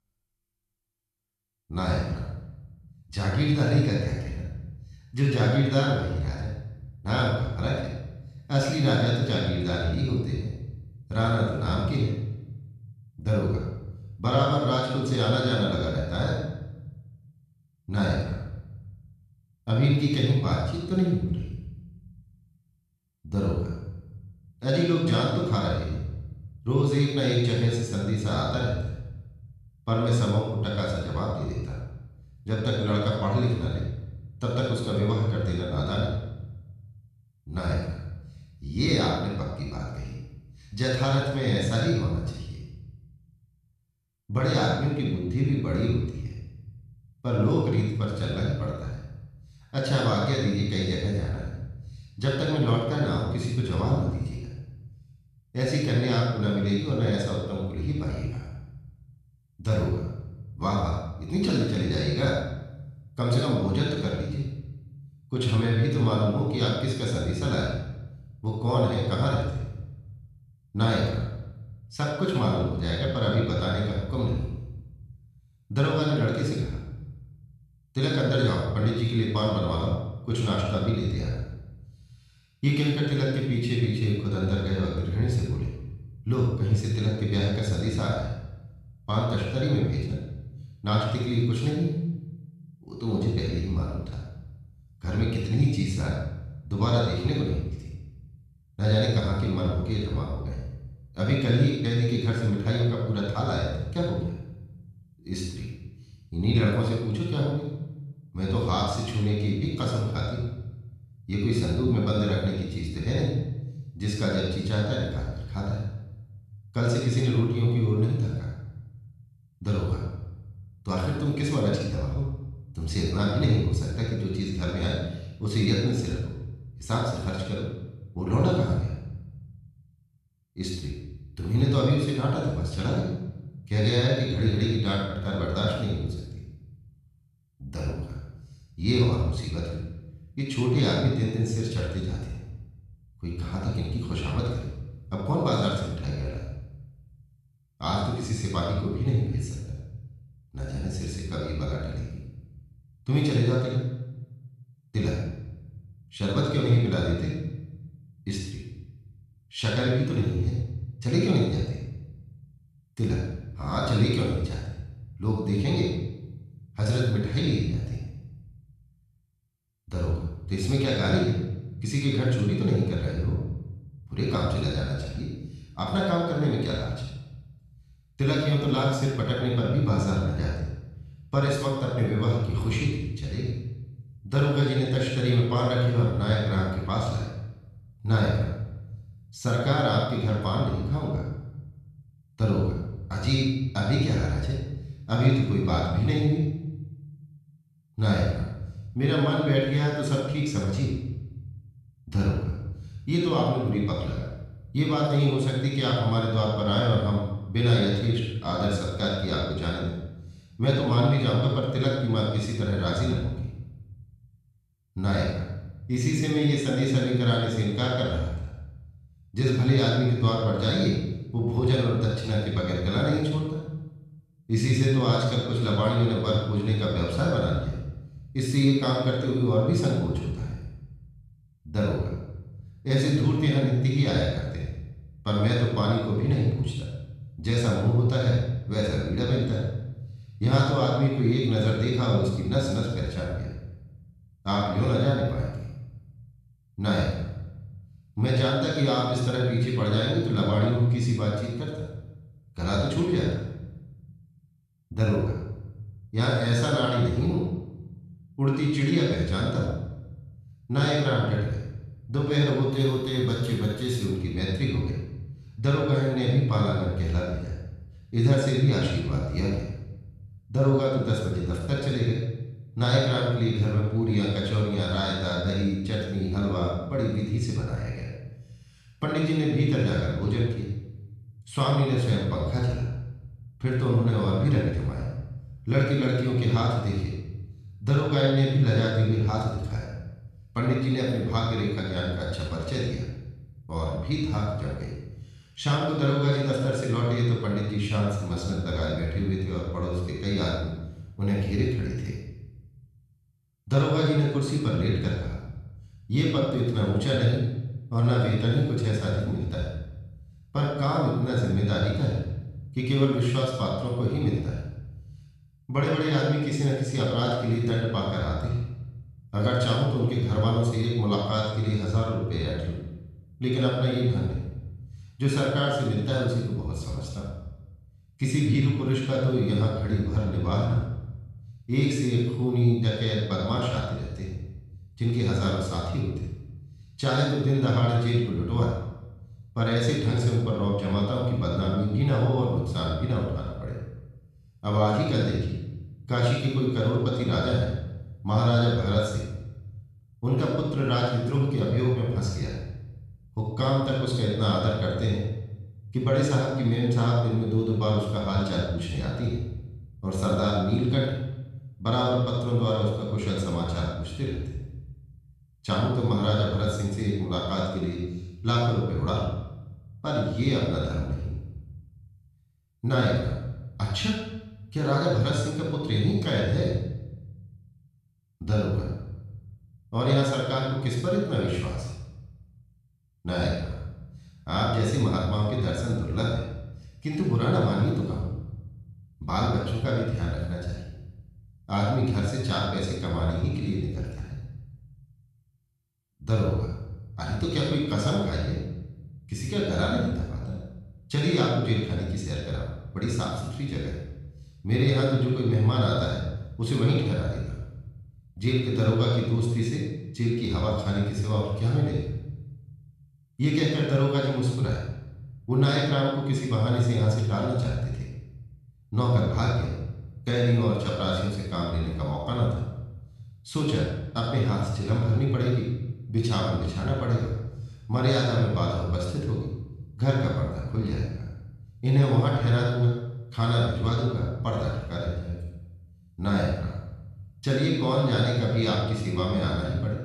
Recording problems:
room echo; strong; dies away in 0.9 s
off-mic speech; far

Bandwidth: 14 kHz